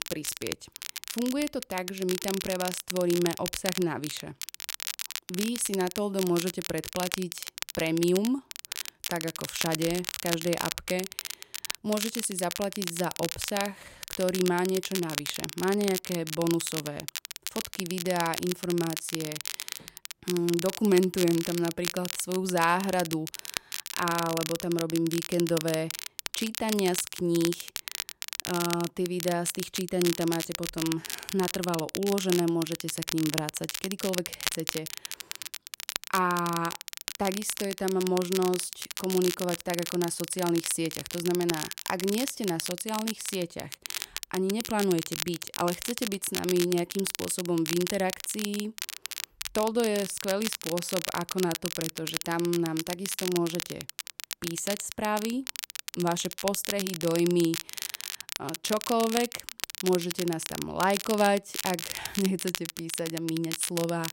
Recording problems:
crackle, like an old record; loud; 5 dB below the speech

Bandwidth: 16 kHz